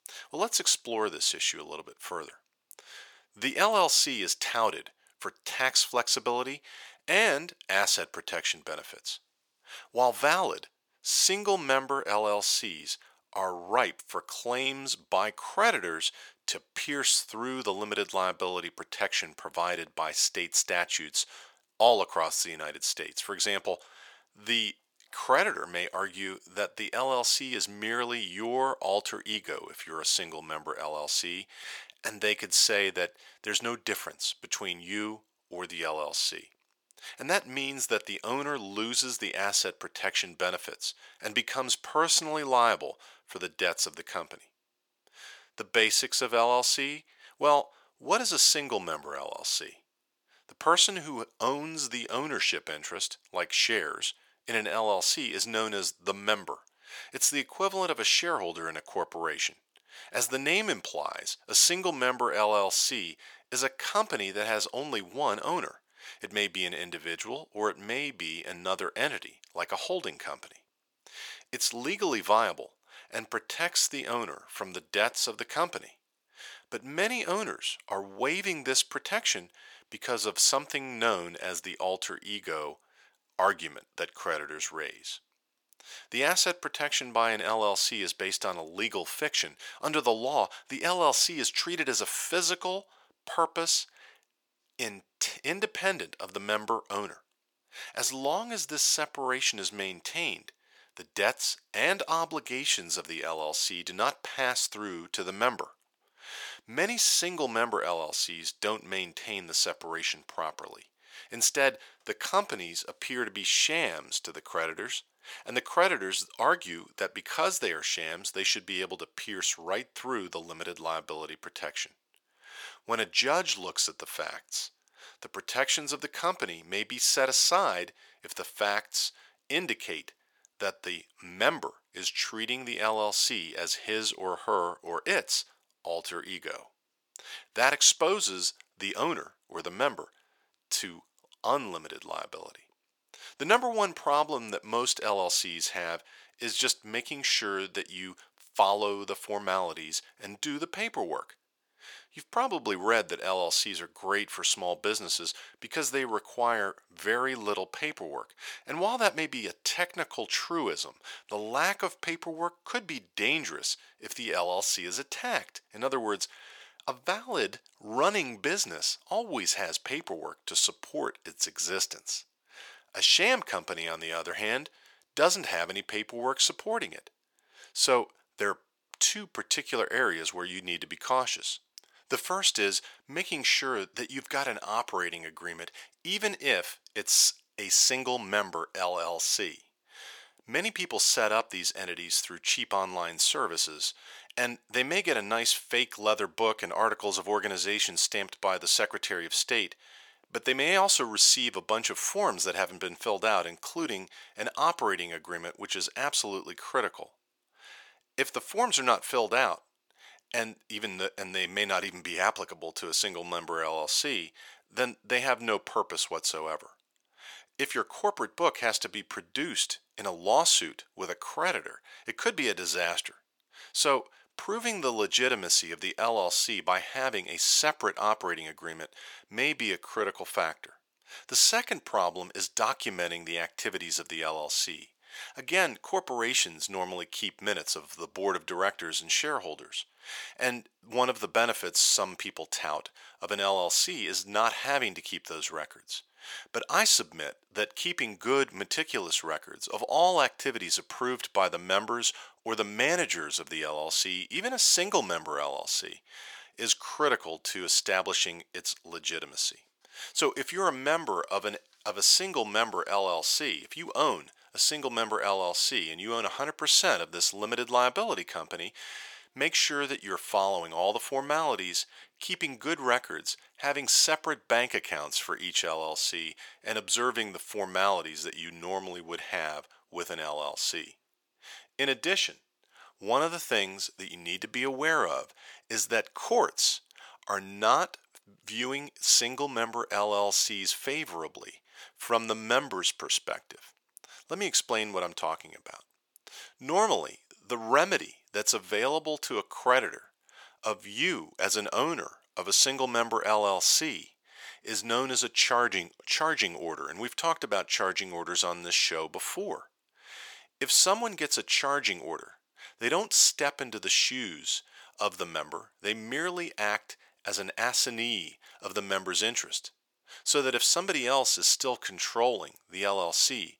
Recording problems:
thin; very; fading below 600 Hz

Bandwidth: 18.5 kHz